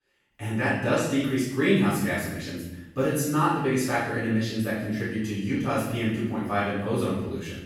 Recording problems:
room echo; strong; dies away in 0.9 s
off-mic speech; far

